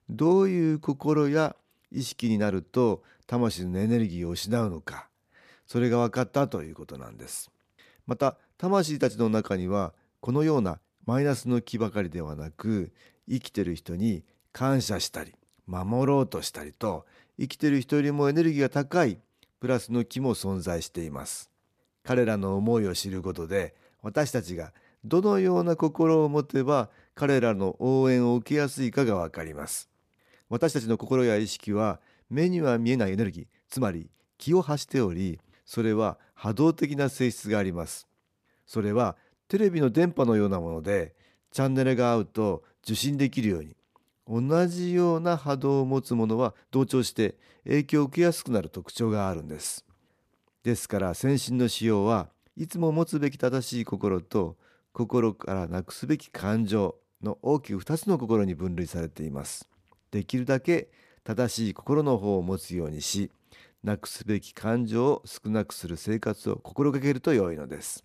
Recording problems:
uneven, jittery; strongly; from 2 s to 1:07

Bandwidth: 14.5 kHz